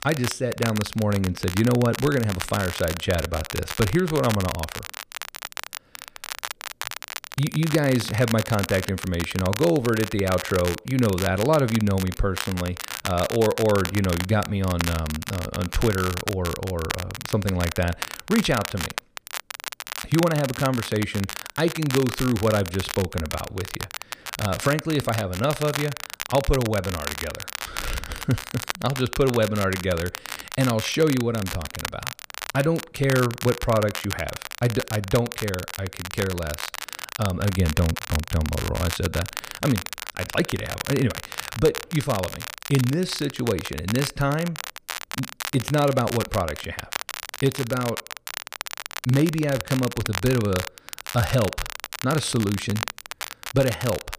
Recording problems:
crackle, like an old record; loud; 8 dB below the speech

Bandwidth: 15 kHz